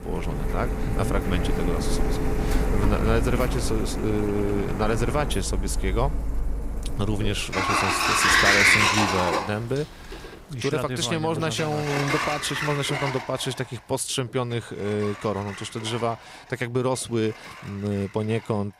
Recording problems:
household noises; very loud; throughout; 3 dB above the speech

